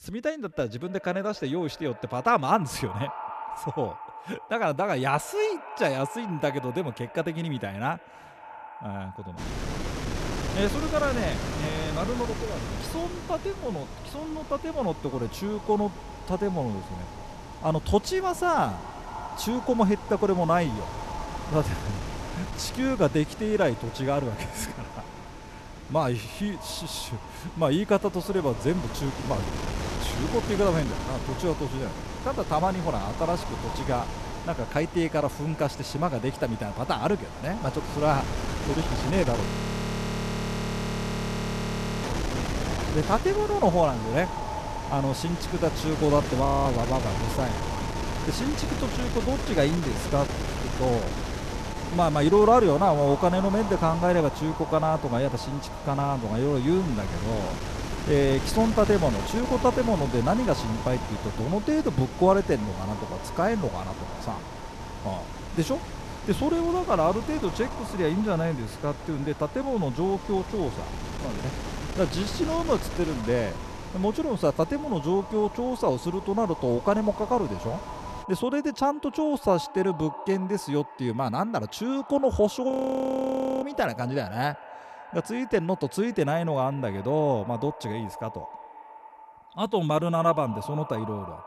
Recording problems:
echo of what is said; noticeable; throughout; 270 ms later, 15 dB below the speech
wind noise on the microphone; heavy; from 9.5 s to 1:18; 10 dB below the speech
audio freezing; at 39 s for 2.5 s, at 46 s and at 1:23 for 1 s

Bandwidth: 13.5 kHz